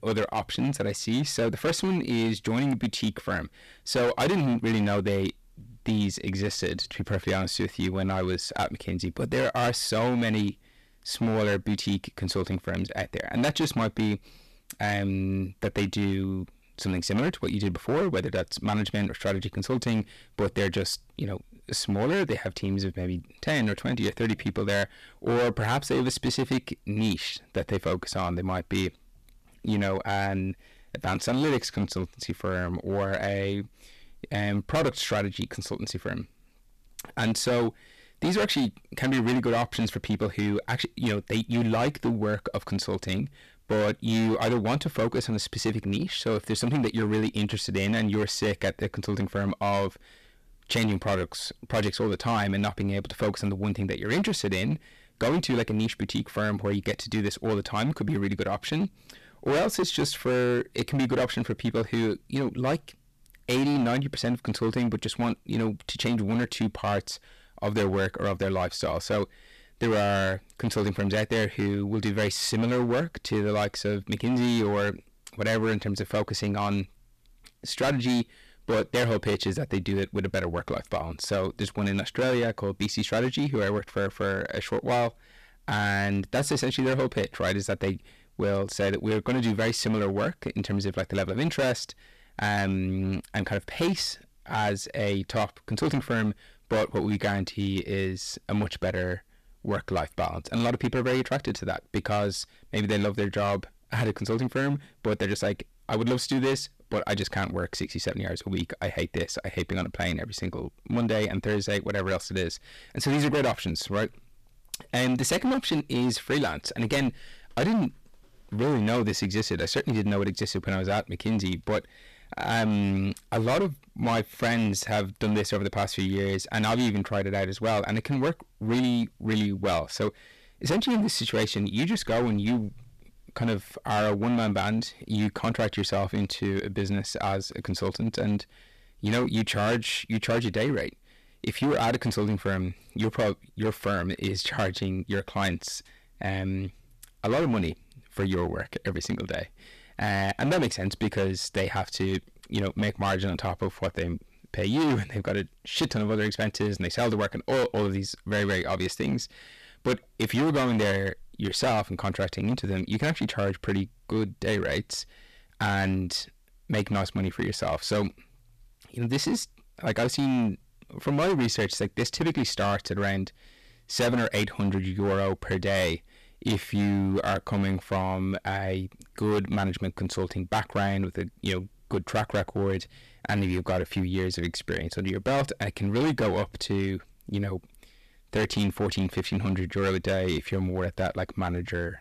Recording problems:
distortion; heavy; 12% of the sound clipped

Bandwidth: 14.5 kHz